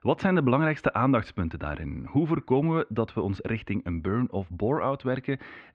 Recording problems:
muffled; very; fading above 2.5 kHz

